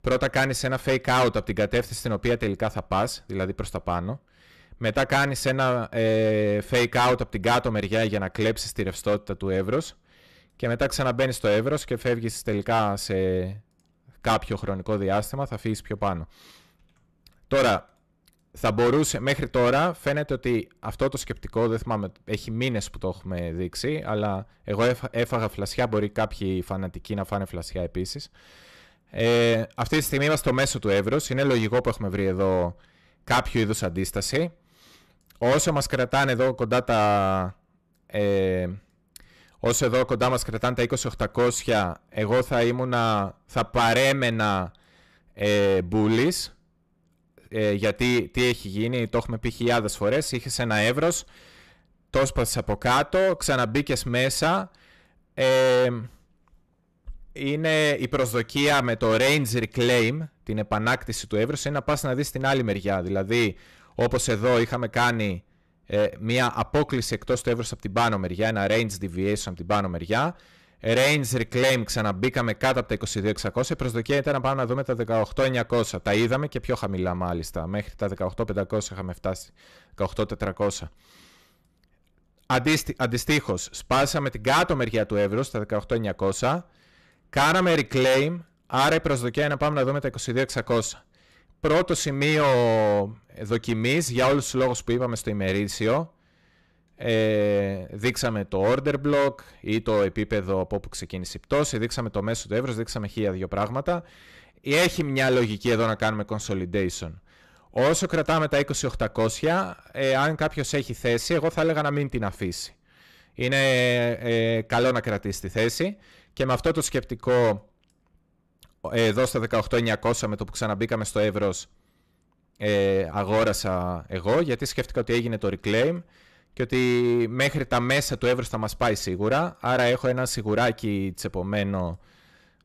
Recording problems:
distortion; heavy; 8% of the sound clipped

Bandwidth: 14 kHz